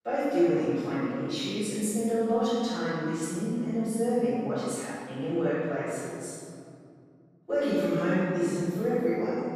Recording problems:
room echo; strong; dies away in 2.6 s
off-mic speech; far

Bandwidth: 14.5 kHz